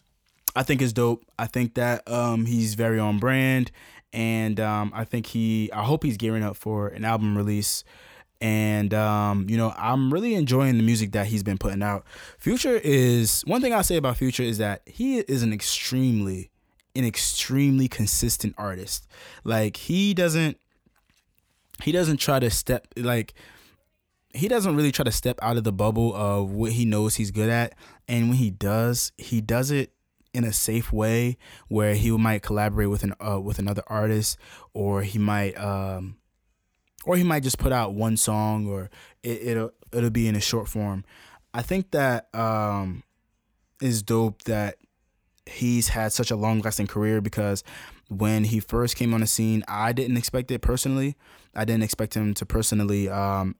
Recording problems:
none

